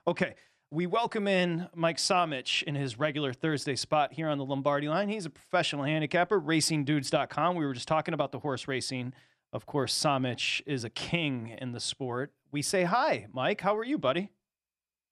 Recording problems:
none

